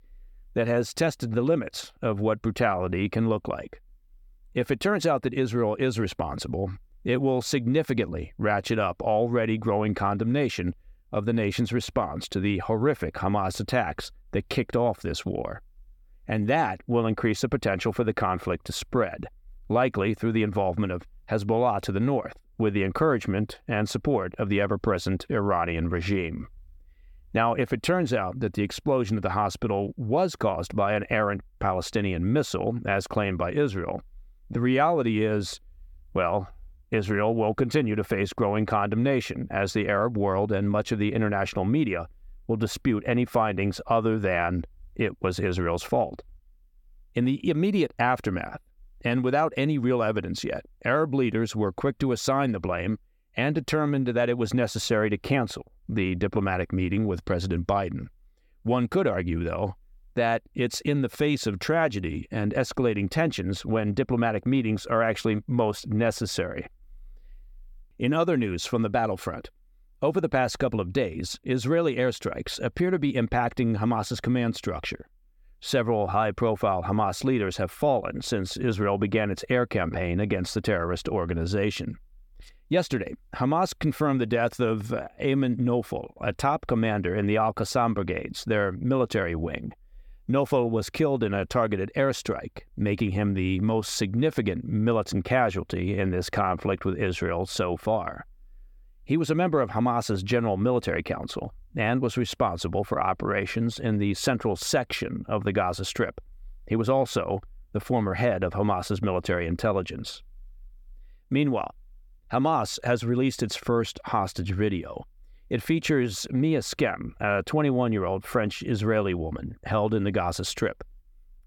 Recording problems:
none

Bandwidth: 17.5 kHz